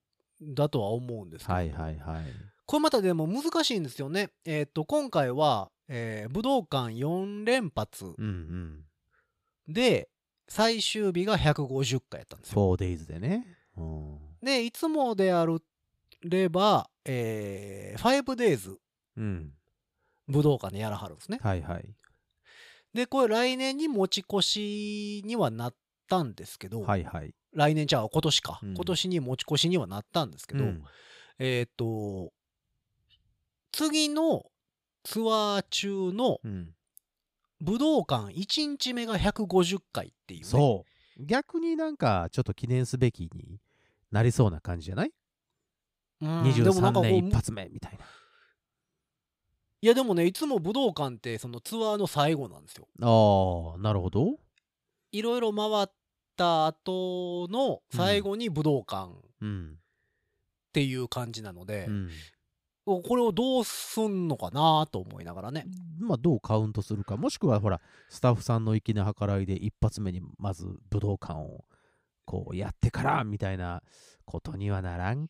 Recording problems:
none

